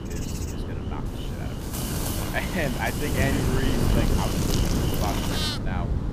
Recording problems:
animal sounds; very loud; throughout; as loud as the speech
wind noise on the microphone; heavy; 3 dB below the speech

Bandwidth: 15 kHz